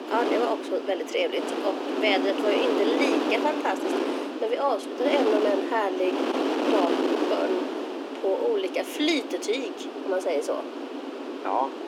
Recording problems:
thin; very slightly; fading below 250 Hz
wind noise on the microphone; heavy; 3 dB below the speech

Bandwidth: 17 kHz